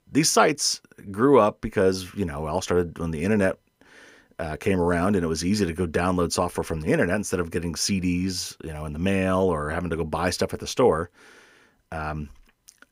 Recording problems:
none

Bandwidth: 15.5 kHz